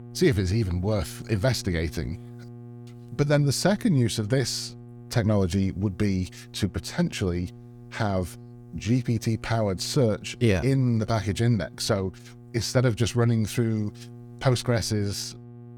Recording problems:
electrical hum; faint; throughout; 60 Hz, 25 dB below the speech

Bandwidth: 19 kHz